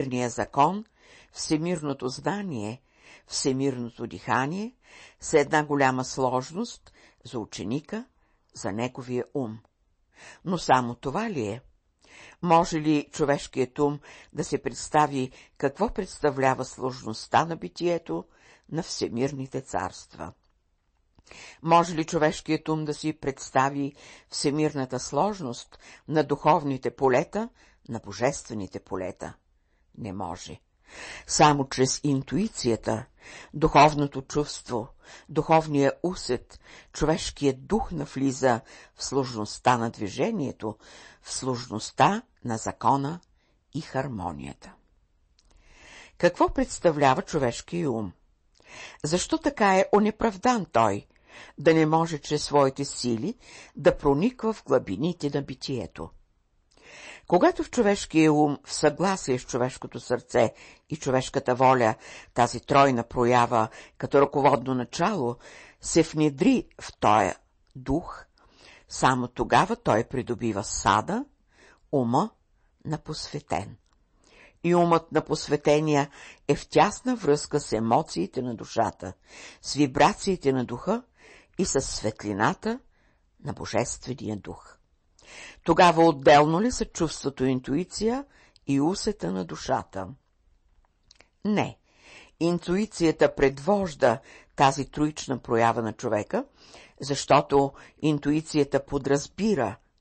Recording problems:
distortion; slight; 0.6% of the sound clipped
garbled, watery; slightly; nothing above 8 kHz
abrupt cut into speech; at the start

